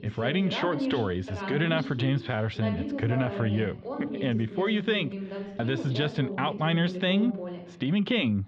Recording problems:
muffled; slightly; fading above 3.5 kHz
voice in the background; loud; throughout; 7 dB below the speech

